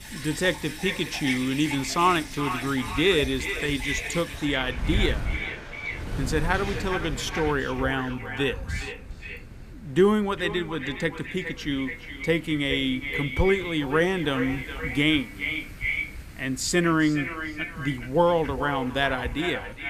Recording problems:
echo of what is said; strong; throughout; 410 ms later, 8 dB below the speech
rain or running water; noticeable; until 7.5 s; 15 dB below the speech
wind noise on the microphone; occasional gusts; 20 dB below the speech

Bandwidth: 15 kHz